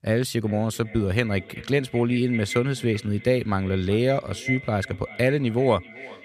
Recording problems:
echo of what is said; noticeable; throughout; 380 ms later, 15 dB below the speech

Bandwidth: 14.5 kHz